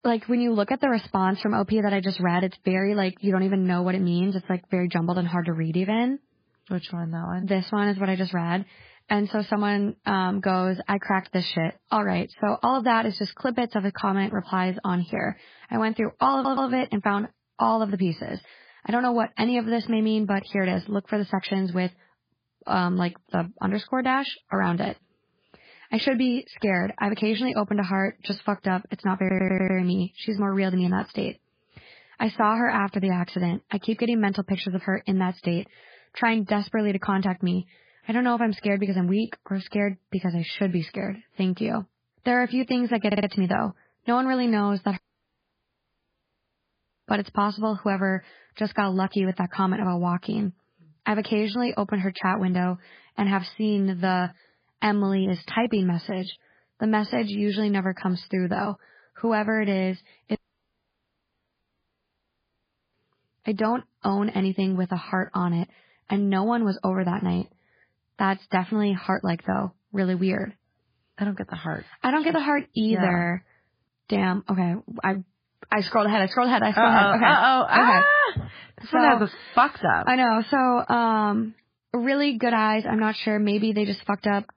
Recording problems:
garbled, watery; badly; nothing above 5 kHz
audio stuttering; at 16 s, at 29 s and at 43 s
audio cutting out; at 45 s for 2 s and at 1:00 for 2.5 s

